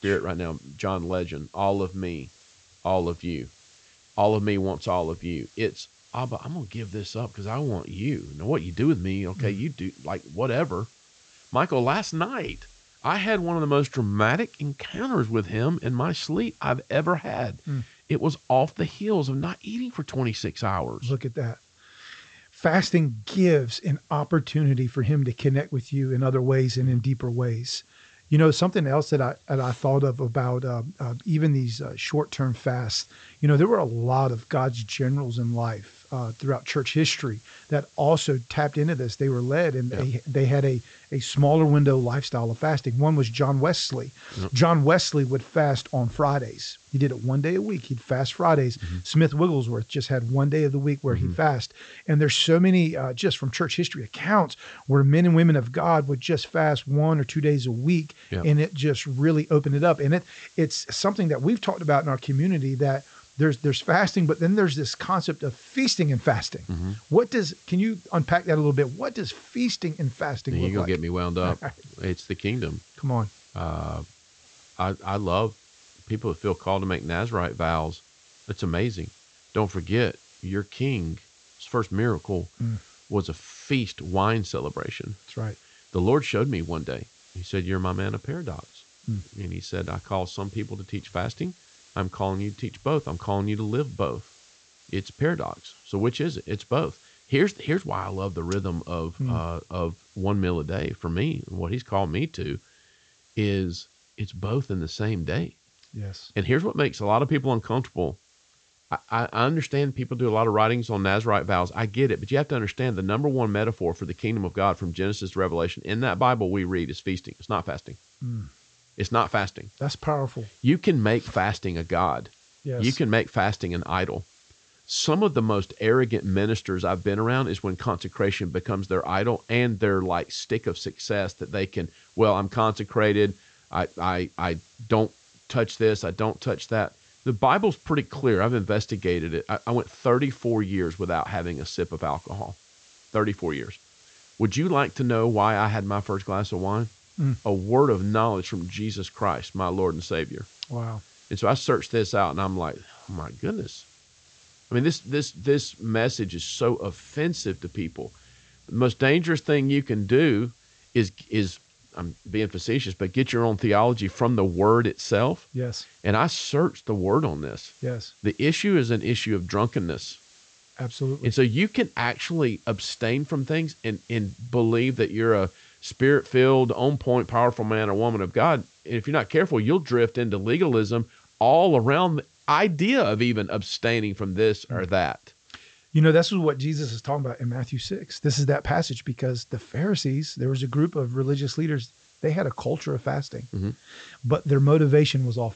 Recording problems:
high frequencies cut off; noticeable; nothing above 8 kHz
hiss; faint; throughout; 30 dB below the speech

